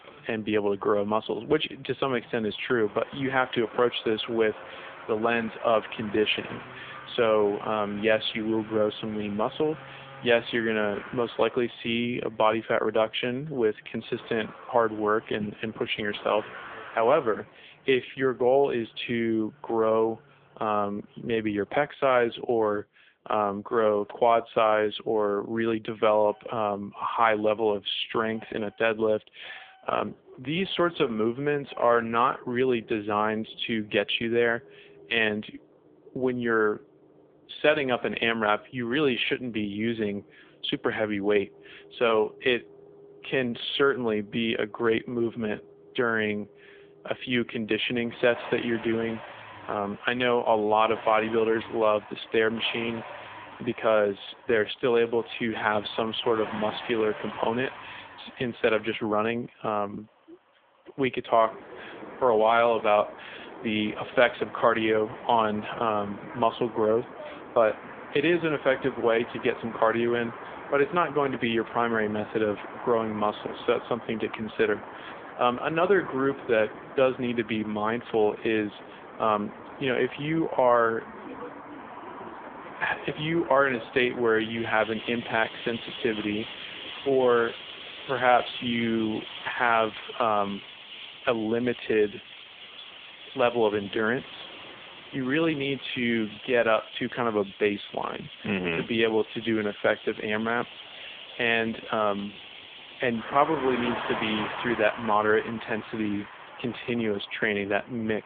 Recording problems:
phone-call audio; poor line; nothing above 3.5 kHz
traffic noise; noticeable; throughout; 15 dB below the speech

